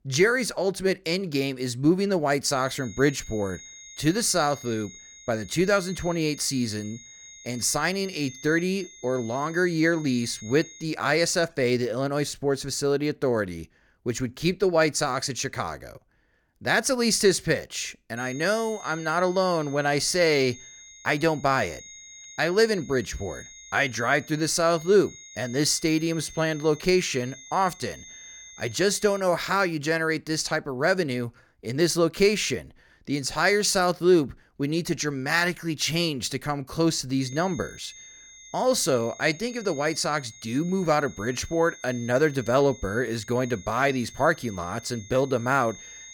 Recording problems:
high-pitched whine; noticeable; from 2.5 to 11 s, from 18 to 29 s and from 37 s on; 6.5 kHz, 20 dB below the speech

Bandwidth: 18 kHz